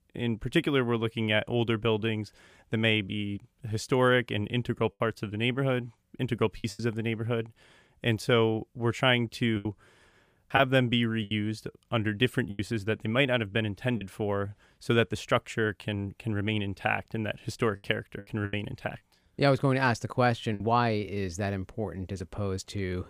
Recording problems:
choppy; occasionally; 4% of the speech affected

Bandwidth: 15 kHz